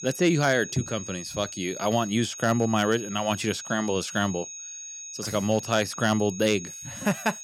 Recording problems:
high-pitched whine; noticeable; throughout; 6.5 kHz, 10 dB below the speech

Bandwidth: 17 kHz